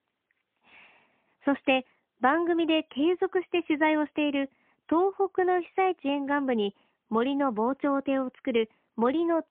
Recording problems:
phone-call audio; poor line

